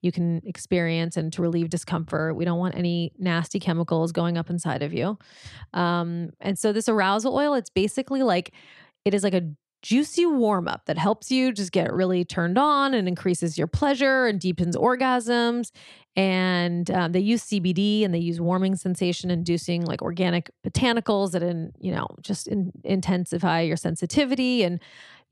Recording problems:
none

